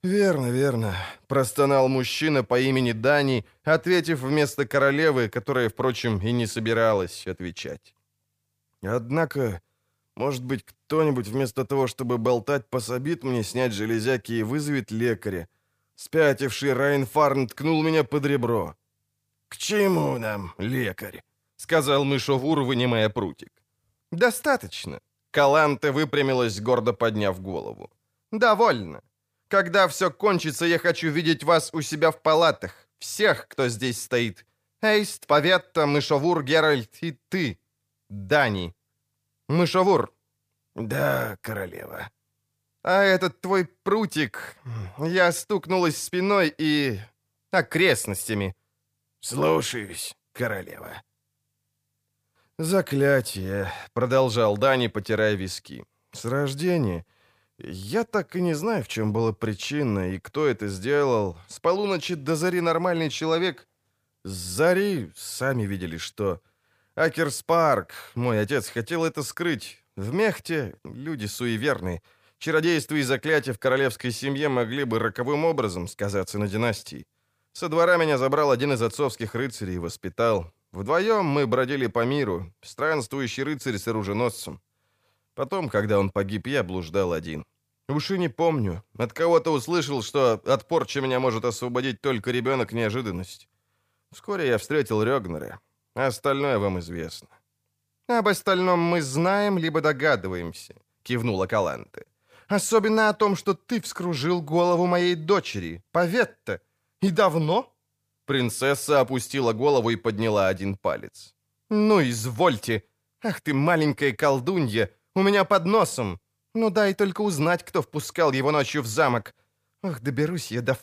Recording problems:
none

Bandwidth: 15 kHz